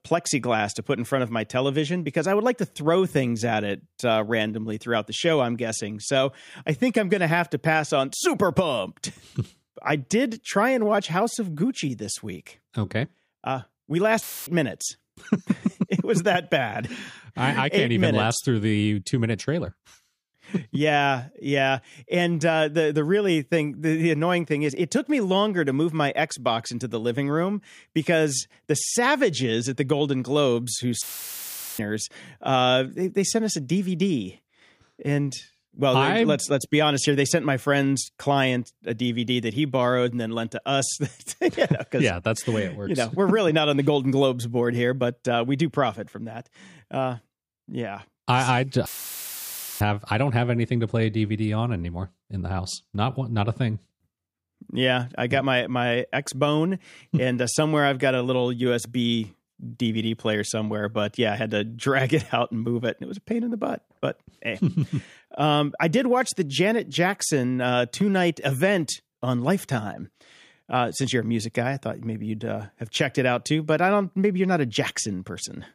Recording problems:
audio cutting out; filled with static; at 14 s, at 31 s for 1 s and at 49 s for 1 s

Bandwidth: 15 kHz